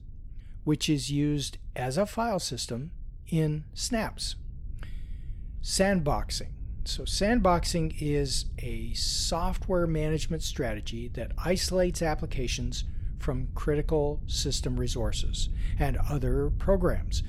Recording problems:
low rumble; faint; throughout; 25 dB below the speech

